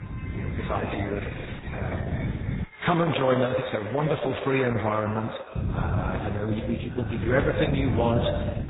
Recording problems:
echo of what is said; strong; throughout; 120 ms later, 7 dB below the speech
garbled, watery; badly; nothing above 4 kHz
alarms or sirens; noticeable; throughout; 20 dB below the speech
wind noise on the microphone; occasional gusts; until 2.5 s and from 5.5 s on; 15 dB below the speech

